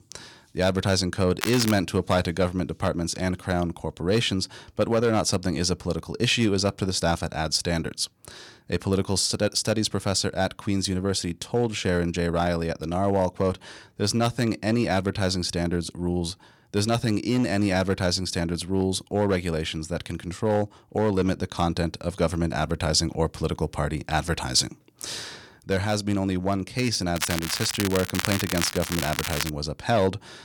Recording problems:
crackling; loud; at 1.5 s and from 27 to 30 s; 4 dB below the speech

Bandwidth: 18 kHz